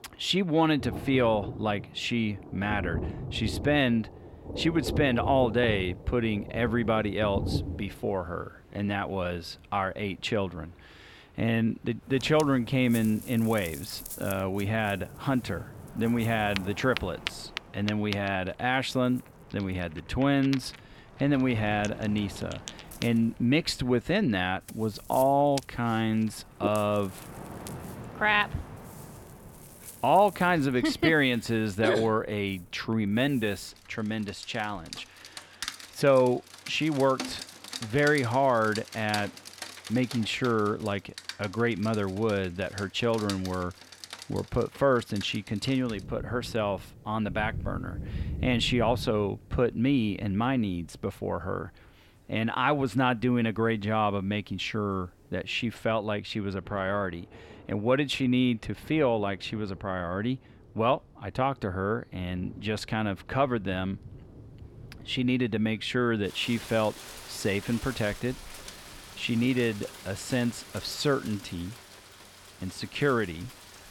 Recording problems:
rain or running water; noticeable; throughout; 15 dB below the speech

